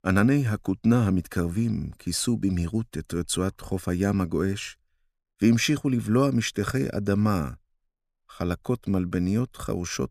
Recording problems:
none

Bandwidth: 14.5 kHz